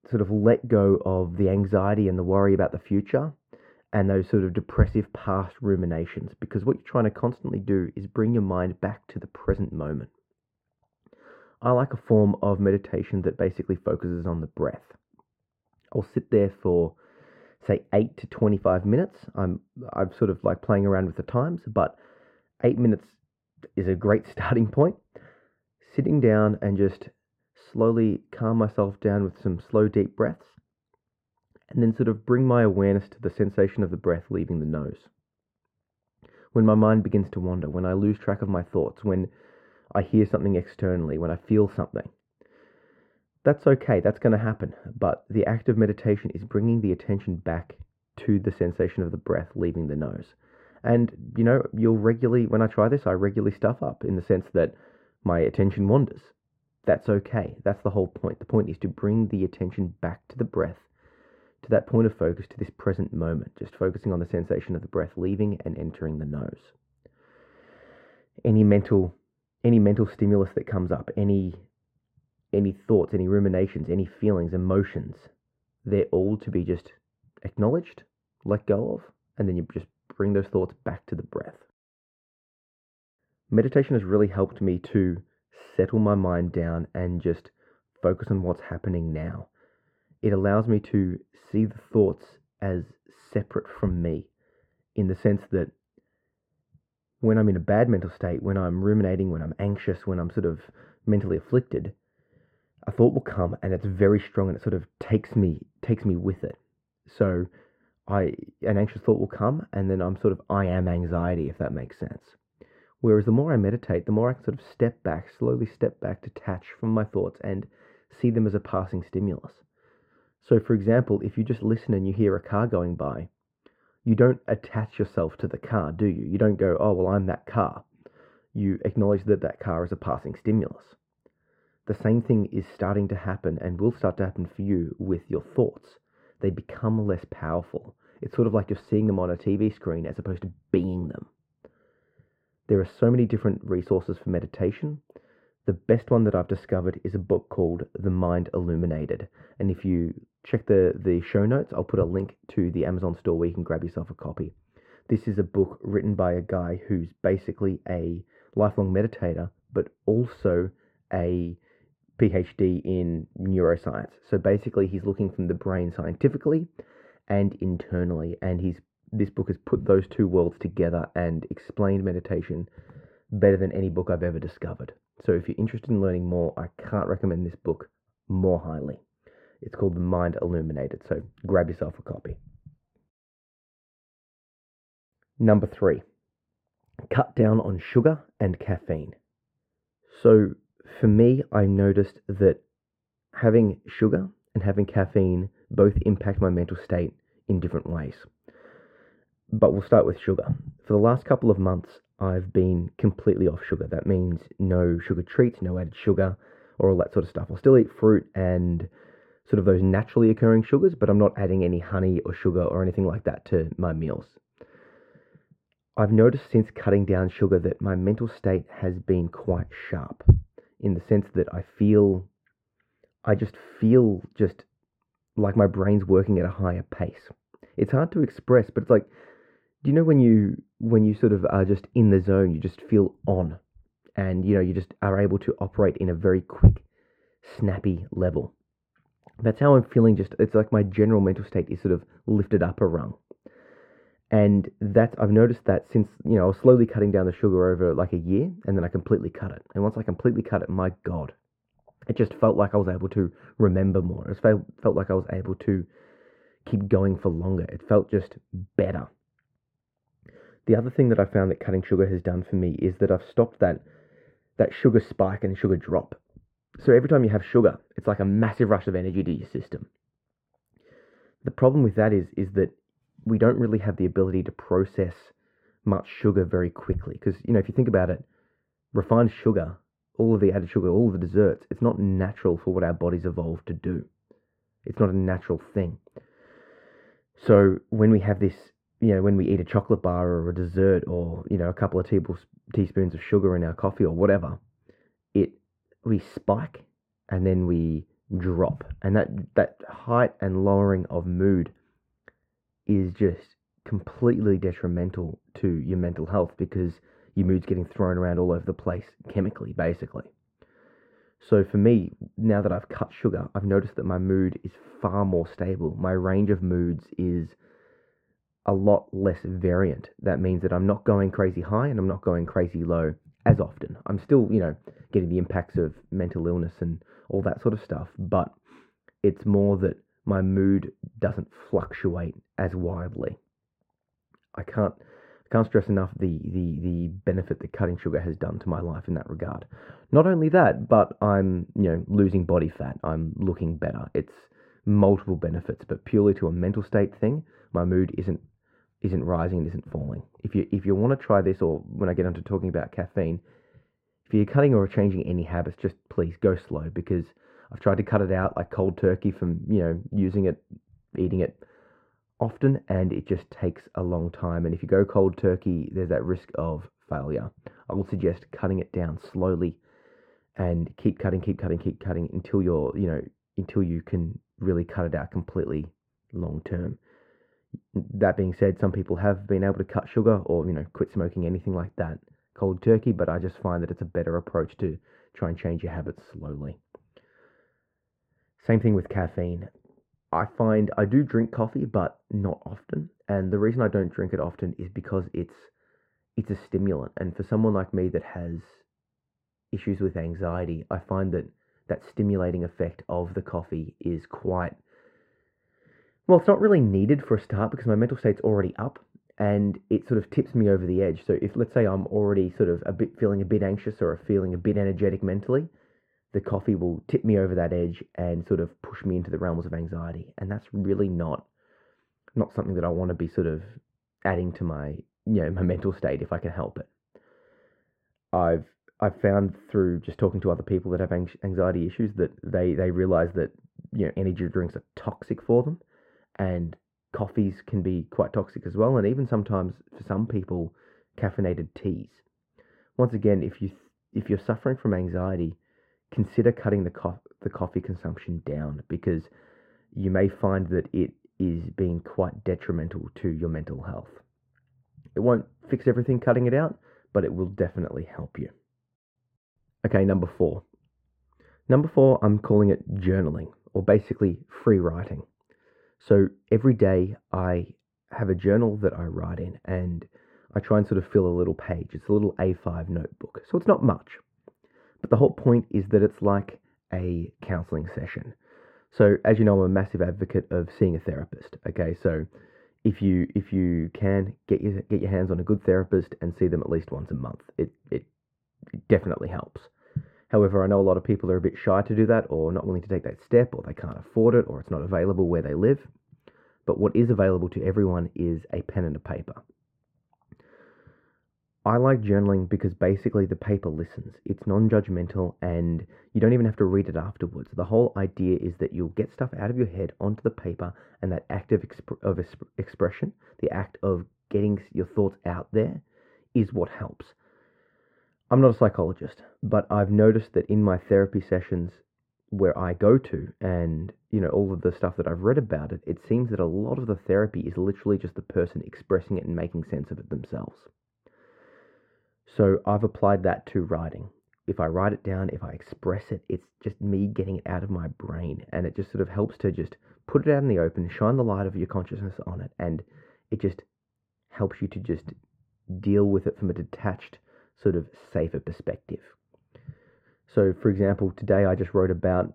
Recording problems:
muffled; very; fading above 3 kHz

